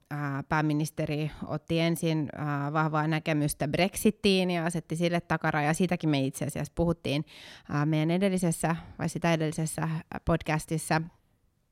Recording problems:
none

